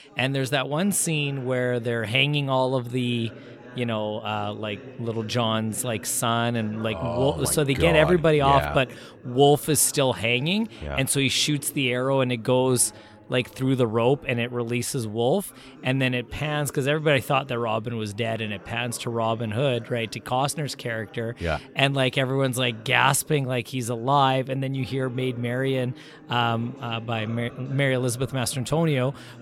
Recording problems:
background chatter; faint; throughout; 4 voices, 20 dB below the speech

